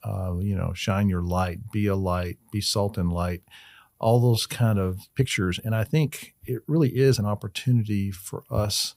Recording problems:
uneven, jittery; strongly; from 4 to 7.5 s

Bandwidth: 15.5 kHz